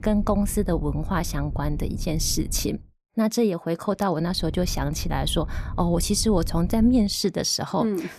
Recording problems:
low rumble; faint; until 3 s and from 4.5 to 7 s; 20 dB below the speech

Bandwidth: 14 kHz